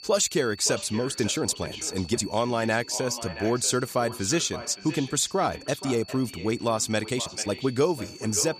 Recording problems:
echo of what is said; noticeable; throughout; 570 ms later, 15 dB below the speech
high-pitched whine; noticeable; throughout; 4.5 kHz, 20 dB below the speech
uneven, jittery; strongly; from 1 to 7.5 s

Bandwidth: 15 kHz